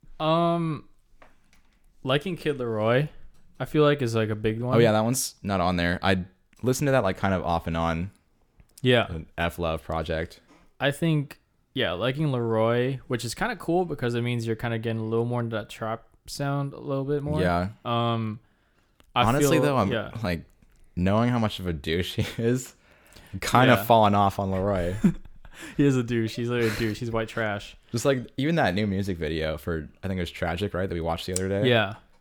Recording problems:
none

